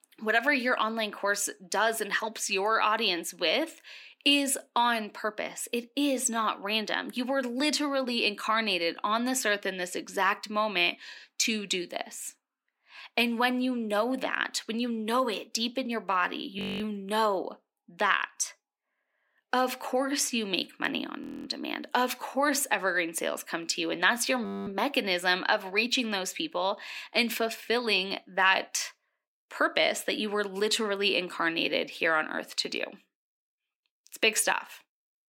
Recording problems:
thin; very slightly; fading below 250 Hz
audio freezing; at 17 s, at 21 s and at 24 s

